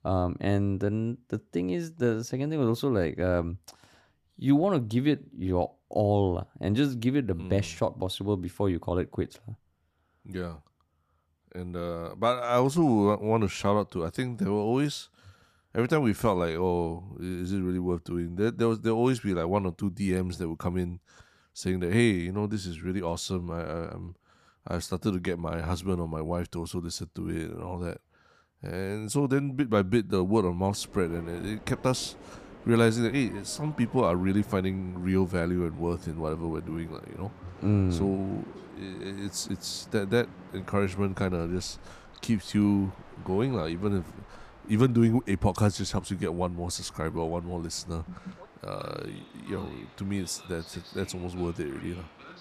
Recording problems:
train or aircraft noise; faint; from 31 s on; 20 dB below the speech

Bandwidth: 14.5 kHz